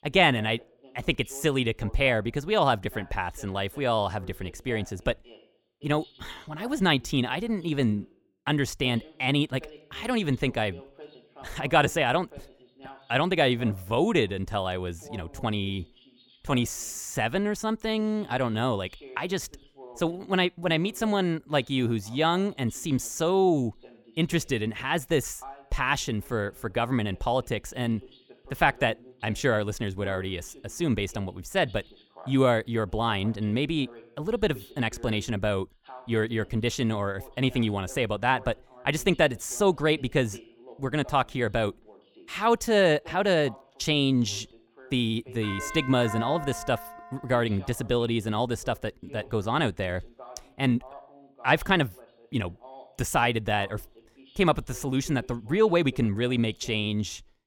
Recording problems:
voice in the background; faint; throughout; 25 dB below the speech
doorbell; noticeable; from 45 to 47 s; peak 8 dB below the speech

